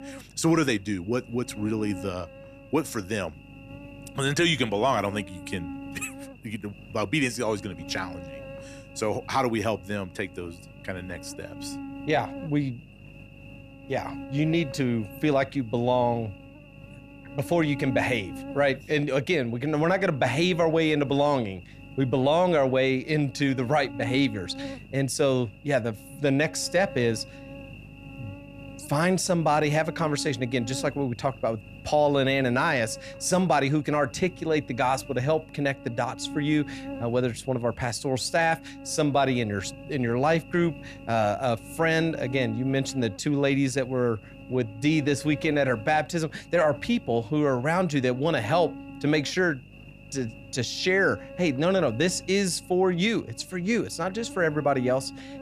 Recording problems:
electrical hum; noticeable; throughout; 50 Hz, 20 dB below the speech

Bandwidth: 14.5 kHz